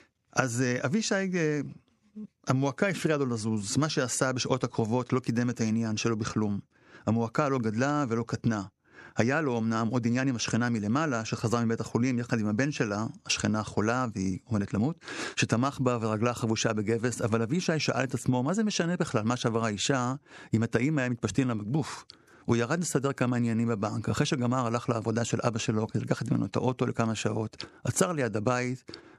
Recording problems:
squashed, flat; somewhat

